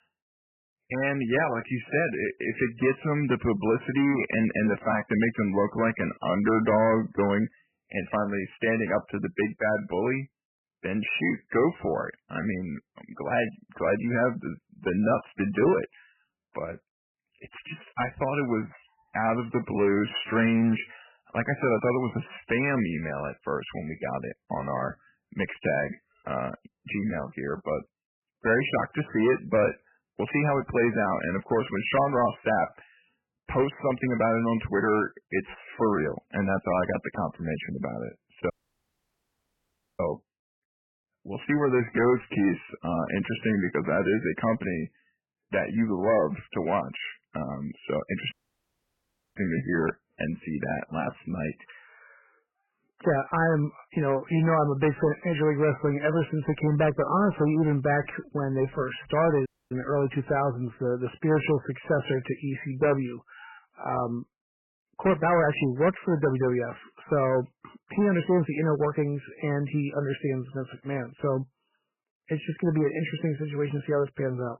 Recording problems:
garbled, watery; badly; nothing above 3 kHz
distortion; slight; 5% of the sound clipped
audio cutting out; at 39 s for 1.5 s, at 48 s for 1 s and at 59 s

